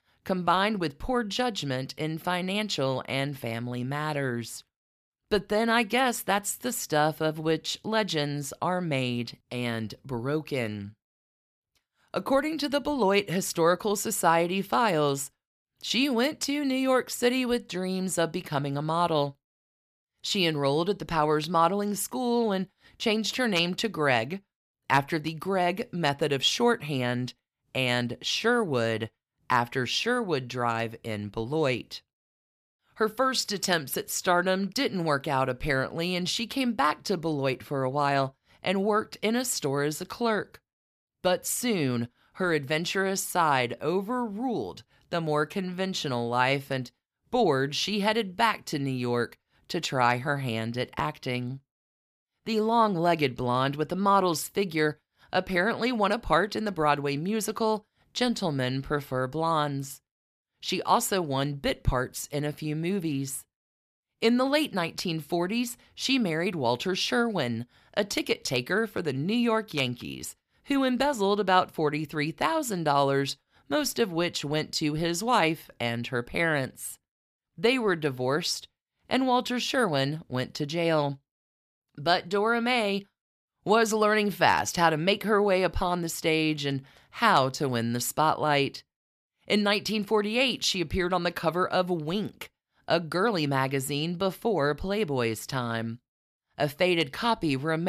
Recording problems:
abrupt cut into speech; at the end

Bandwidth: 15 kHz